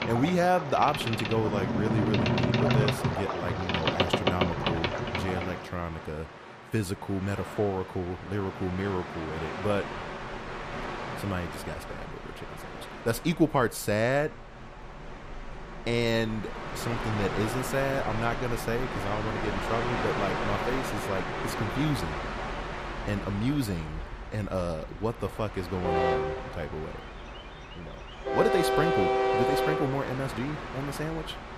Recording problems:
train or aircraft noise; loud; throughout; 1 dB below the speech

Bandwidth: 14.5 kHz